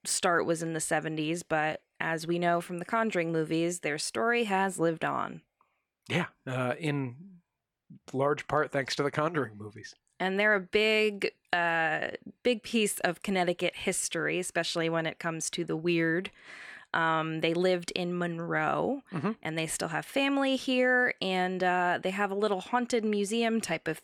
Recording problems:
none

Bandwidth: 17.5 kHz